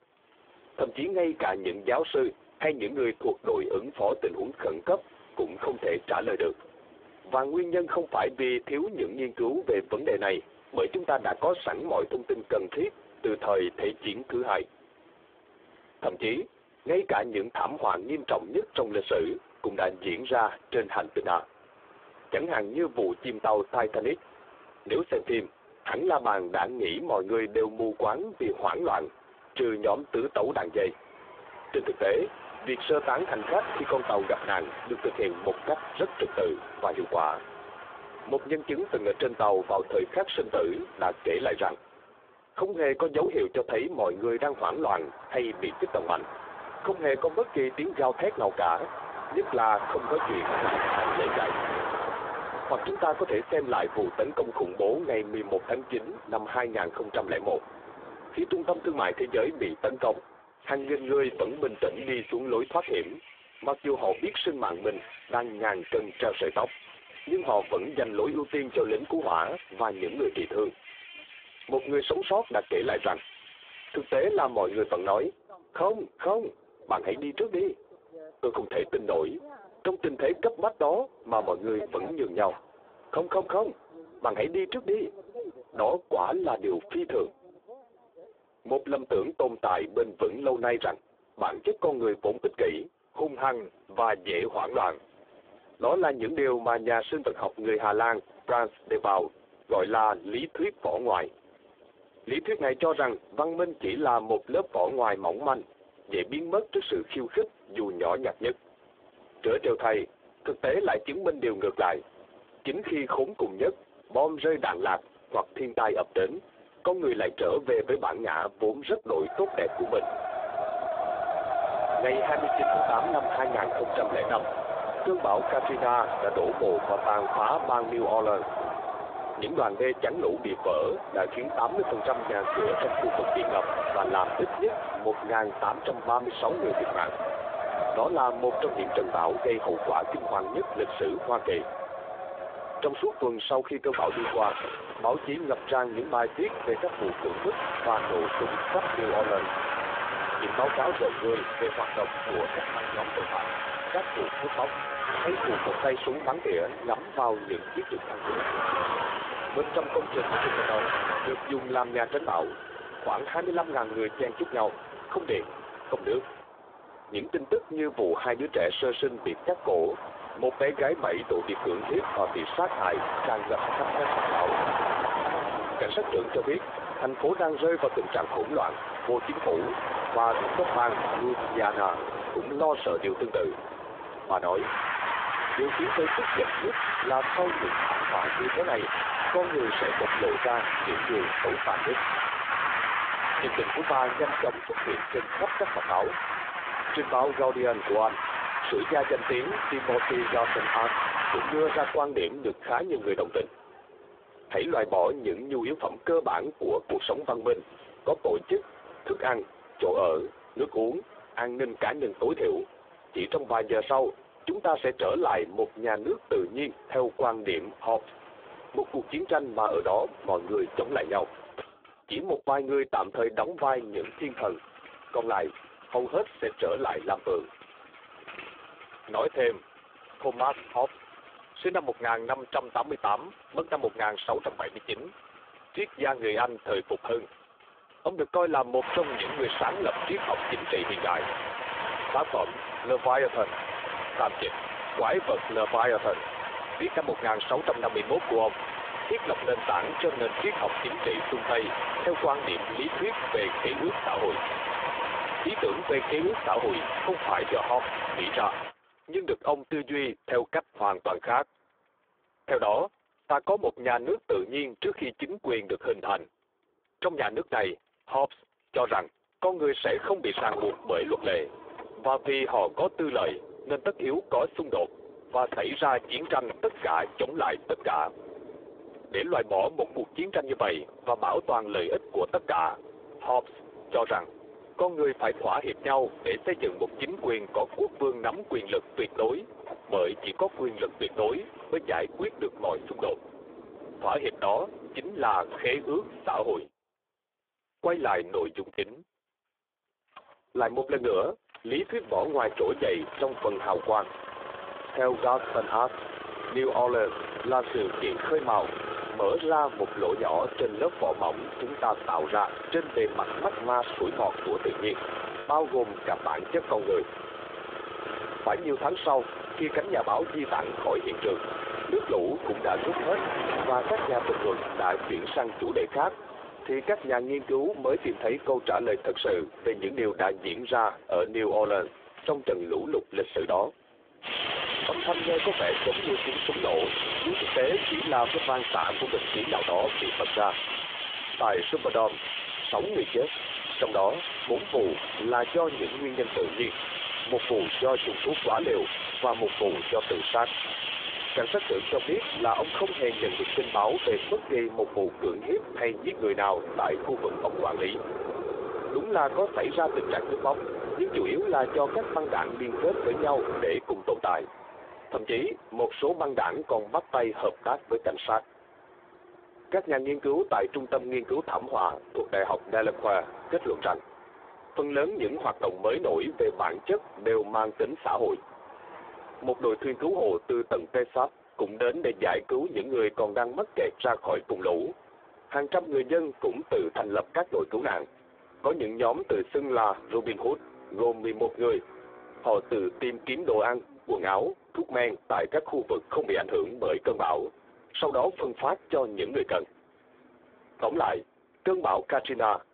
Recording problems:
phone-call audio; poor line
squashed, flat; somewhat
traffic noise; loud; throughout; 4 dB below the speech
choppy; occasionally; at 4:59 and at 5:15; 4% of the speech affected

